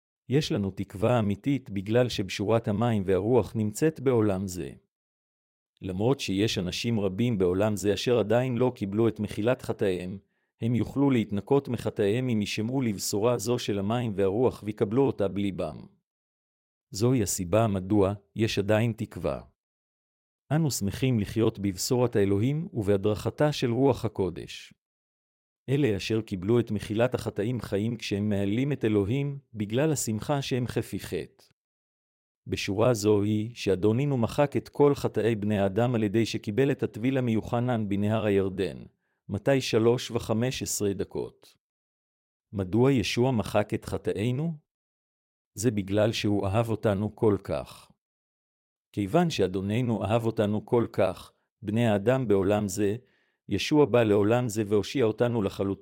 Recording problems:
none

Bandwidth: 16 kHz